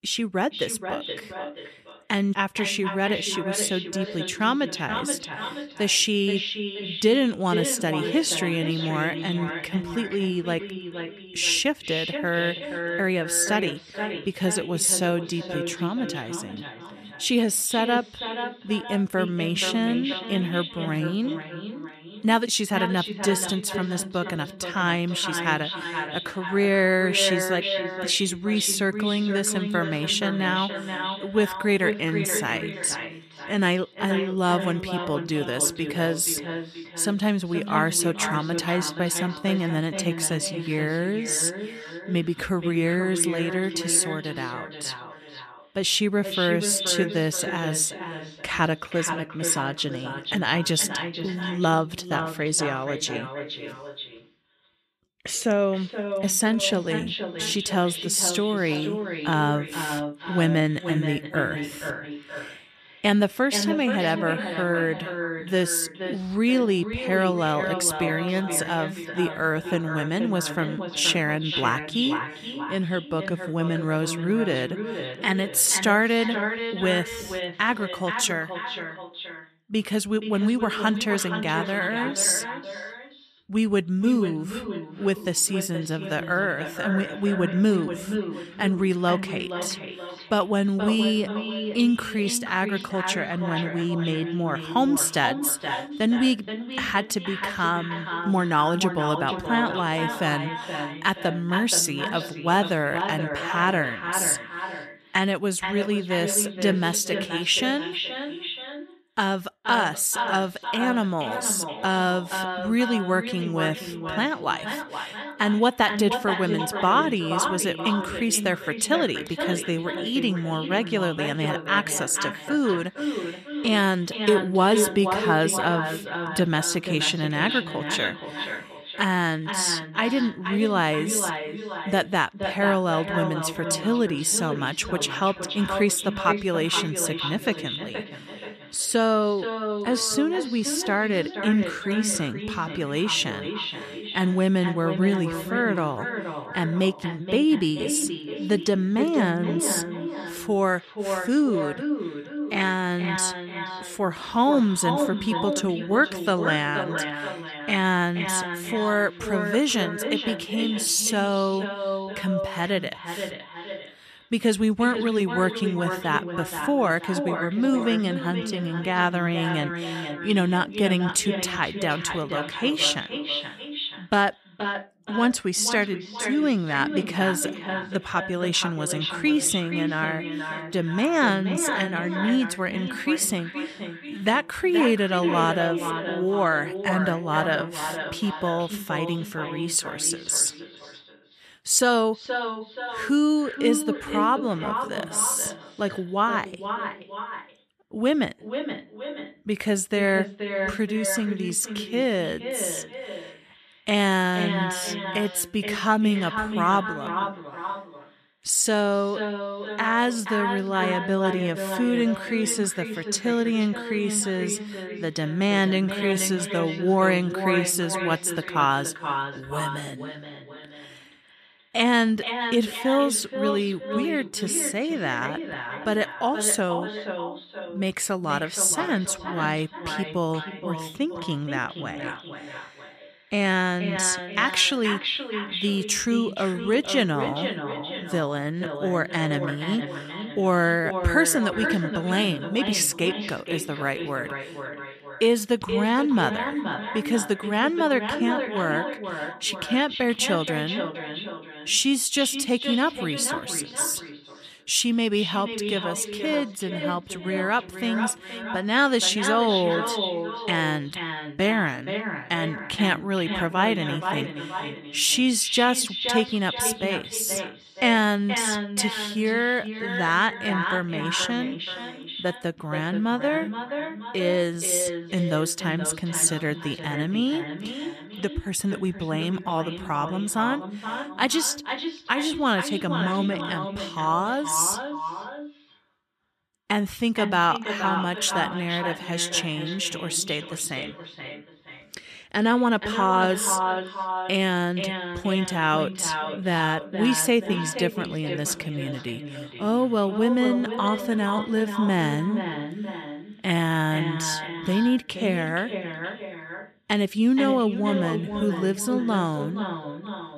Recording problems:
echo of what is said; strong; throughout; 470 ms later, 7 dB below the speech

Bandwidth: 14.5 kHz